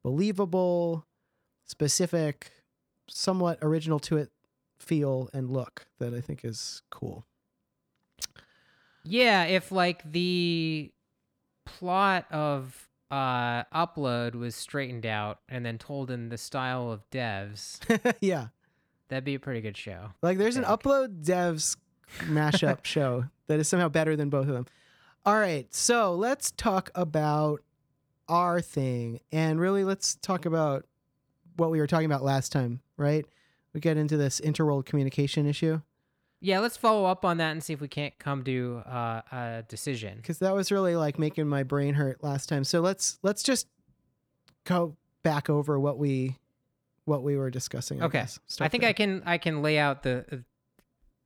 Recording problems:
none

